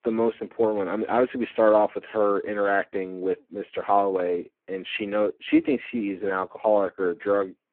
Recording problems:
phone-call audio; poor line

